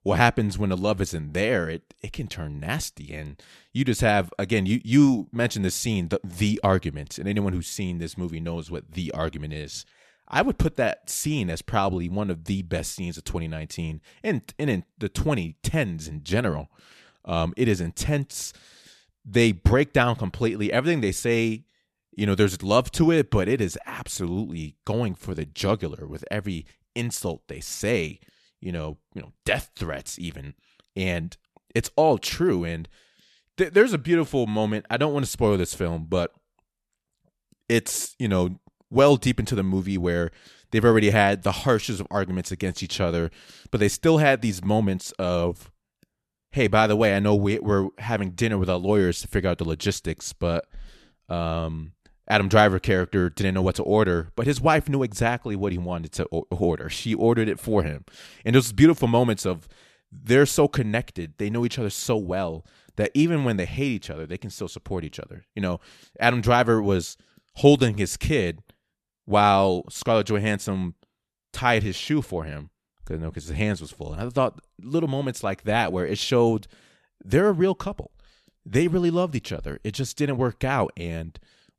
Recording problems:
none

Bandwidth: 13.5 kHz